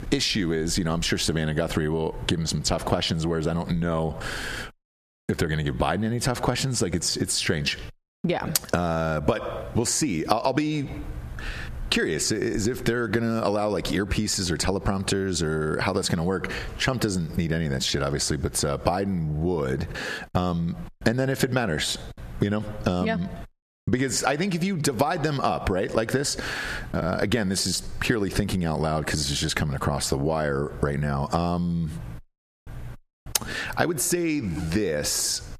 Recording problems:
squashed, flat; heavily

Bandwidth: 14.5 kHz